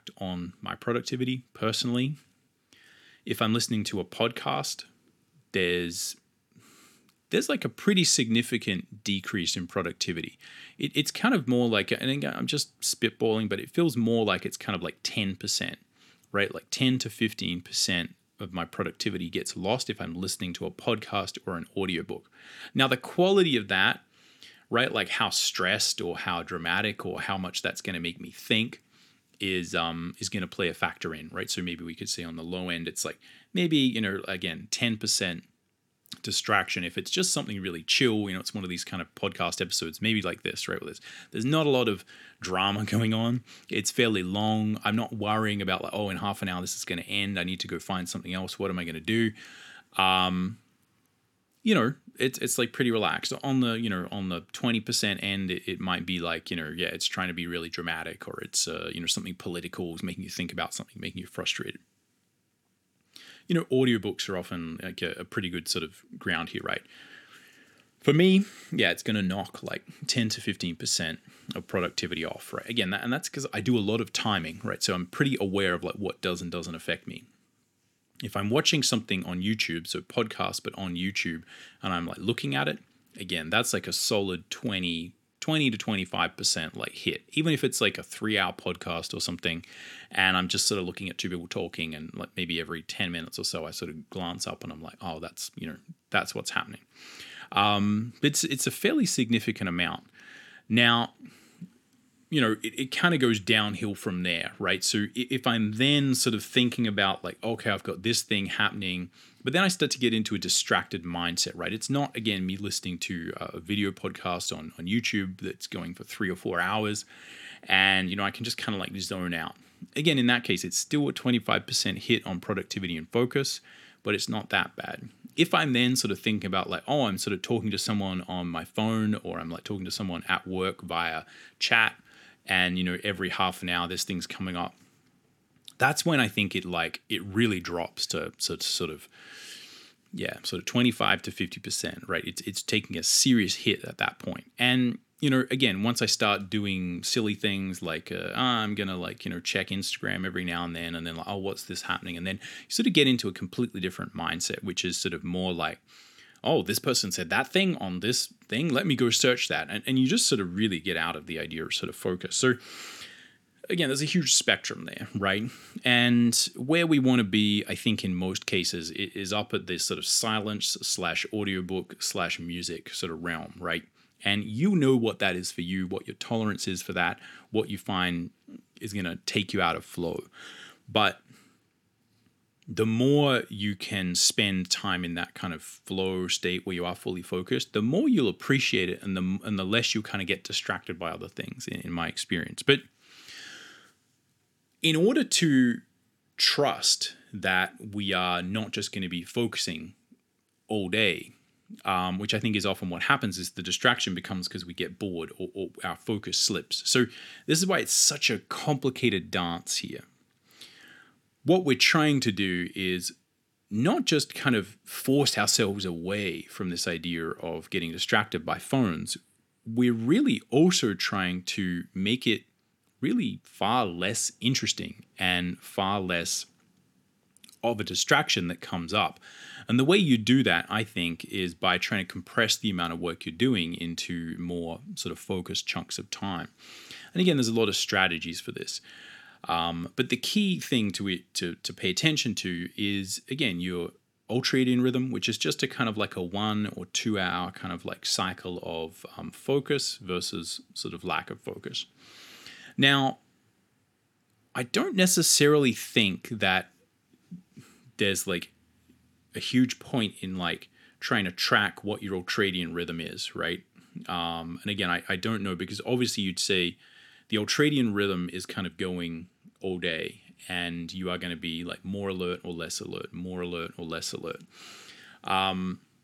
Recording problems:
none

